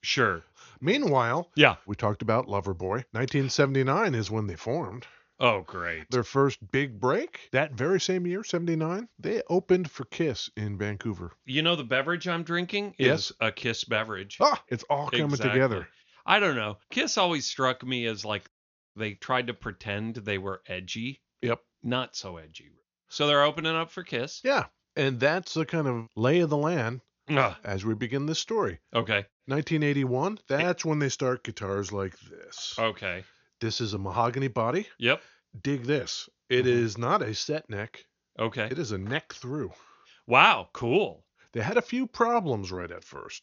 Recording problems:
high frequencies cut off; noticeable; nothing above 6.5 kHz

